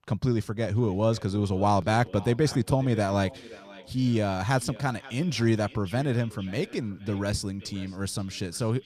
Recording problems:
echo of what is said; faint; throughout; 530 ms later, 20 dB below the speech

